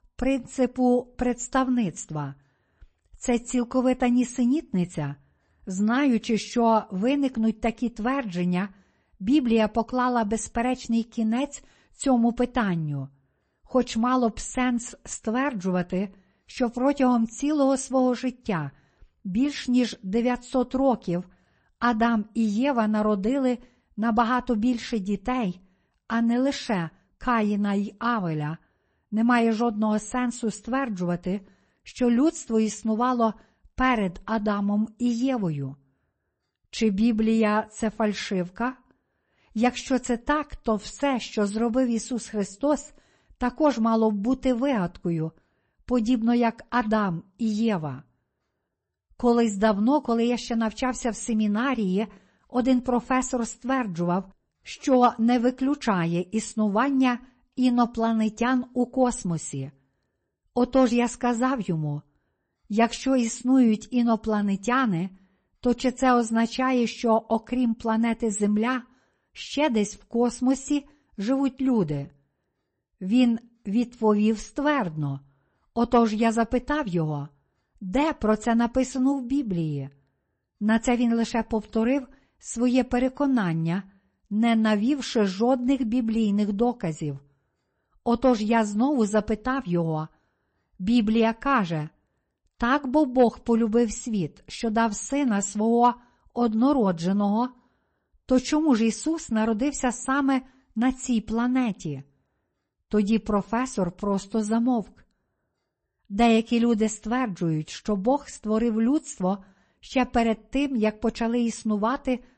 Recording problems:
garbled, watery; slightly; nothing above 8 kHz

